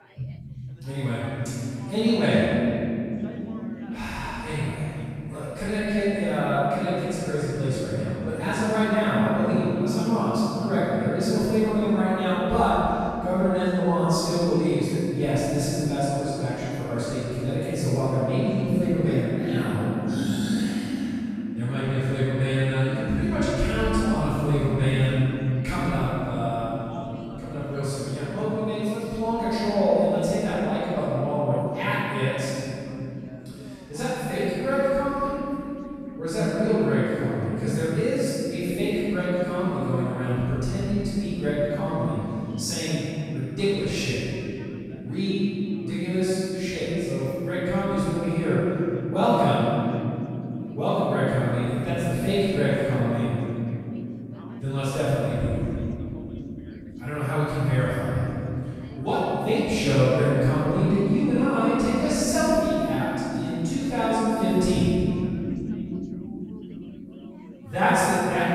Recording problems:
room echo; strong; dies away in 3 s
off-mic speech; far
background chatter; faint; throughout; 4 voices, 25 dB below the speech

